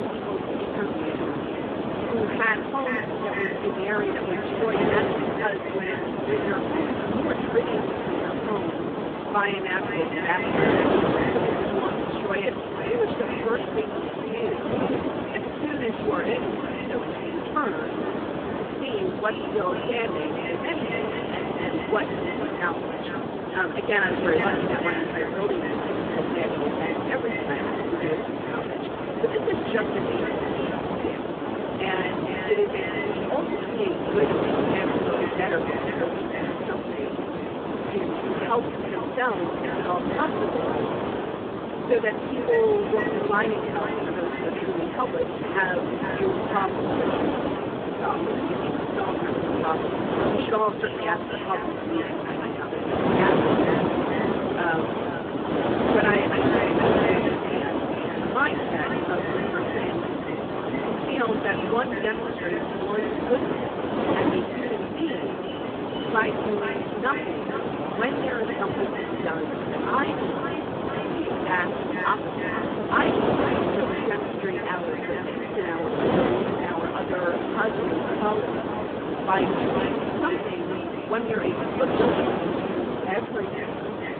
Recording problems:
phone-call audio; poor line
echo of what is said; strong; throughout; 460 ms later, 9 dB below the speech
wind noise on the microphone; heavy; as loud as the speech
murmuring crowd; very faint; throughout; 25 dB below the speech
uneven, jittery; strongly; from 5 s to 1:24

